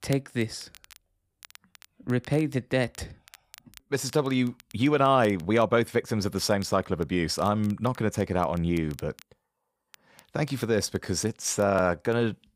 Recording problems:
crackle, like an old record; faint; 25 dB below the speech

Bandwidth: 15 kHz